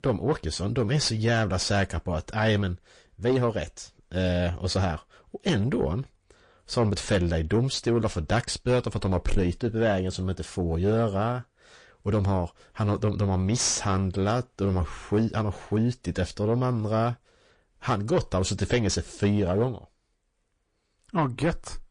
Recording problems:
distortion; slight; 10 dB below the speech
garbled, watery; slightly; nothing above 8 kHz

